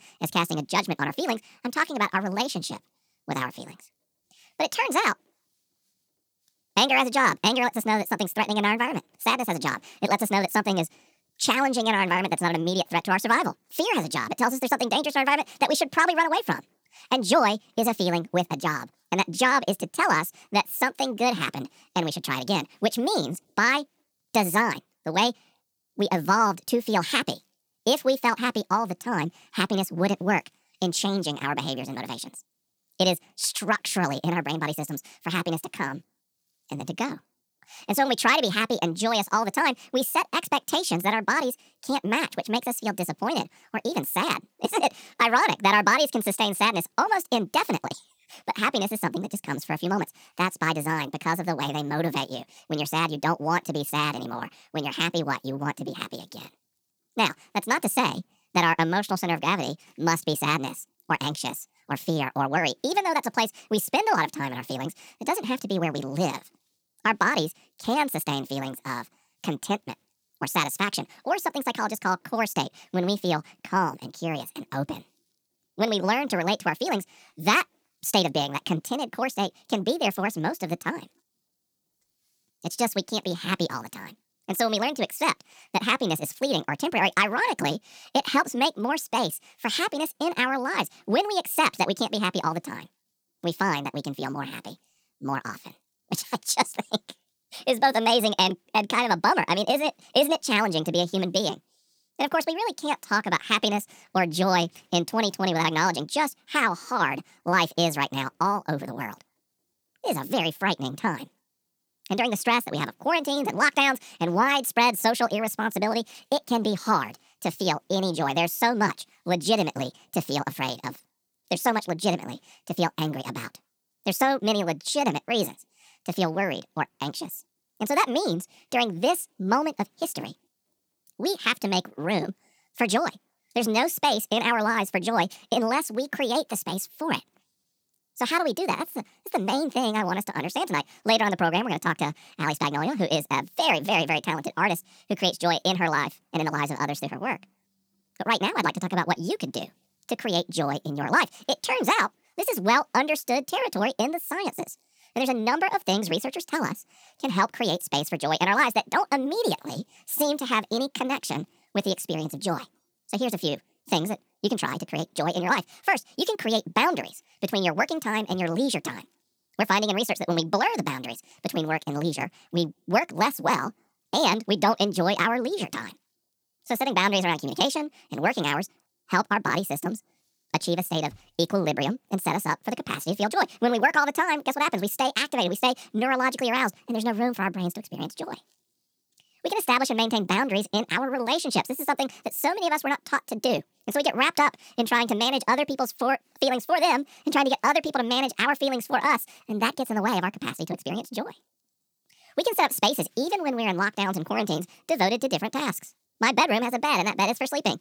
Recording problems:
wrong speed and pitch; too fast and too high; 1.6 times normal speed

